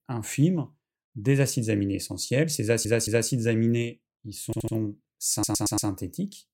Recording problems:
audio stuttering; at 2.5 s, at 4.5 s and at 5.5 s

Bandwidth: 16.5 kHz